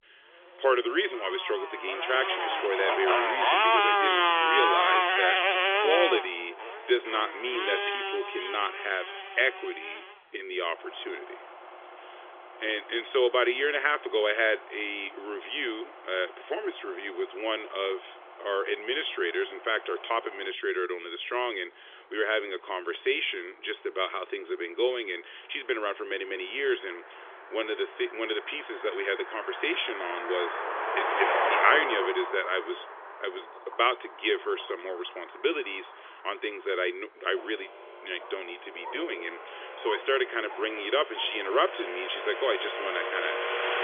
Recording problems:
phone-call audio; nothing above 3.5 kHz
traffic noise; very loud; throughout; 1 dB above the speech

